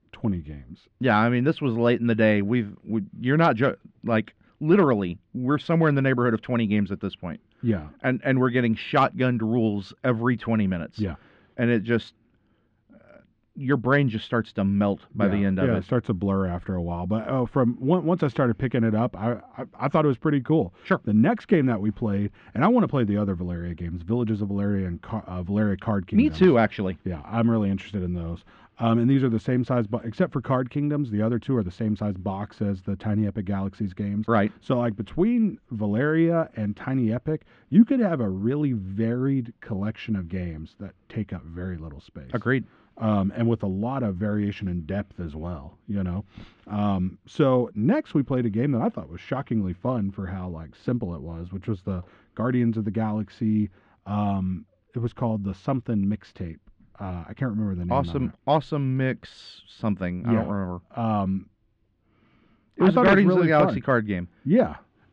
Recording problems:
muffled; slightly; fading above 3.5 kHz

